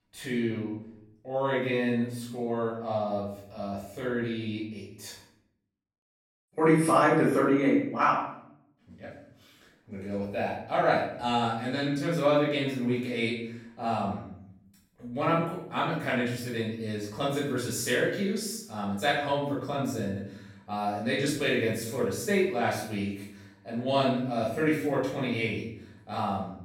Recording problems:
off-mic speech; far
room echo; noticeable; dies away in 0.6 s

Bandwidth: 16.5 kHz